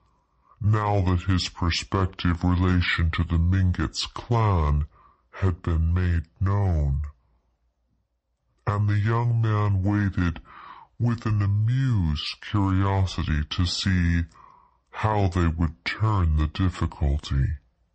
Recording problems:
wrong speed and pitch; too slow and too low; 0.6 times normal speed

